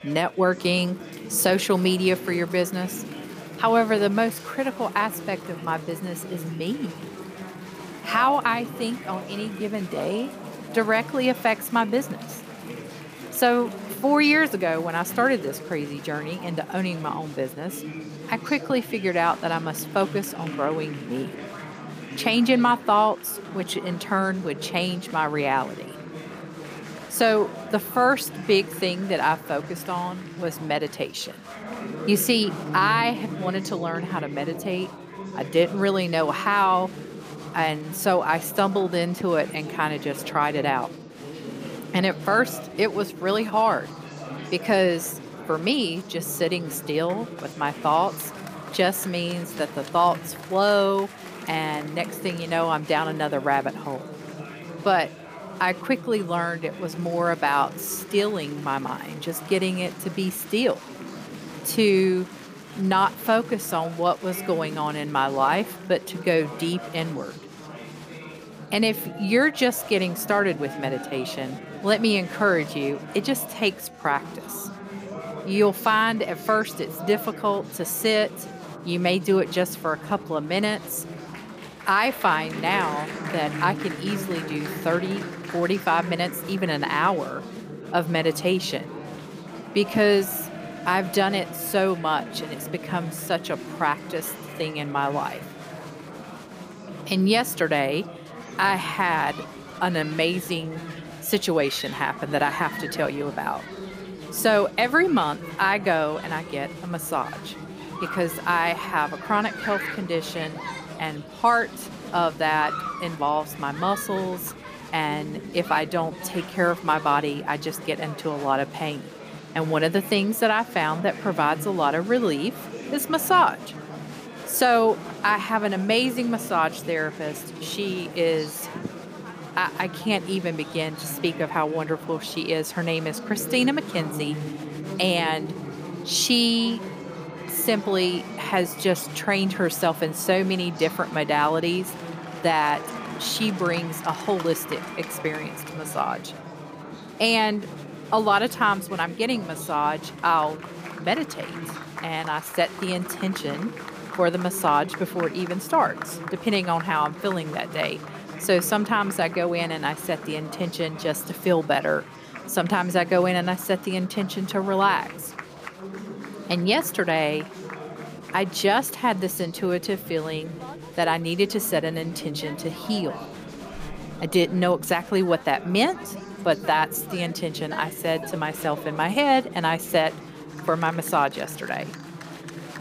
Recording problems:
chatter from many people; noticeable; throughout; 10 dB below the speech

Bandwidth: 15 kHz